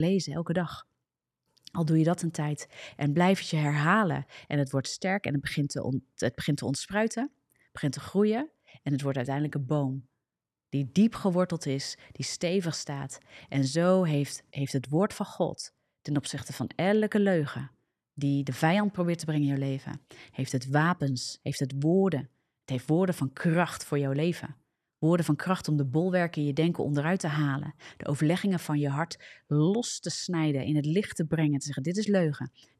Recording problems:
abrupt cut into speech; at the start

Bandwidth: 13.5 kHz